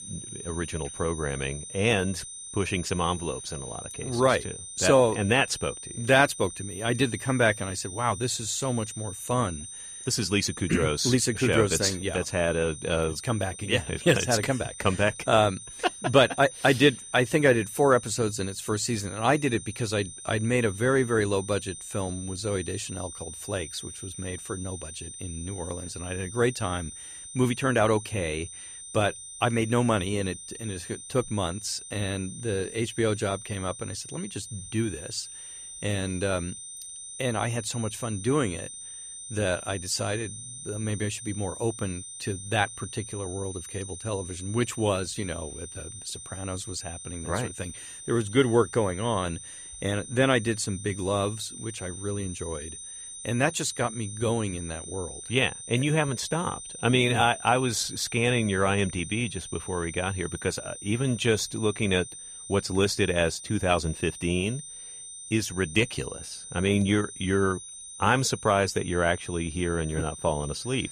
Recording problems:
high-pitched whine; noticeable; throughout; 9 kHz, 10 dB below the speech

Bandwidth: 14.5 kHz